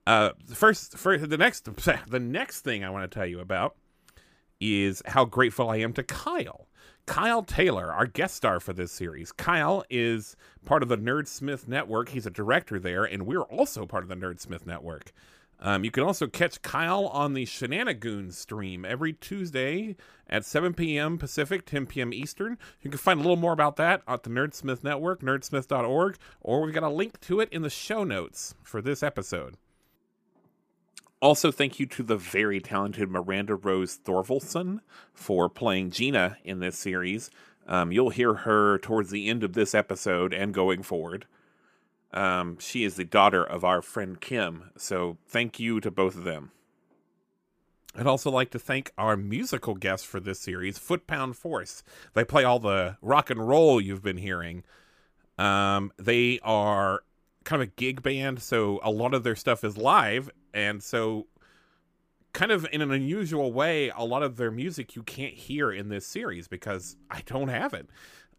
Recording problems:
none

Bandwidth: 15 kHz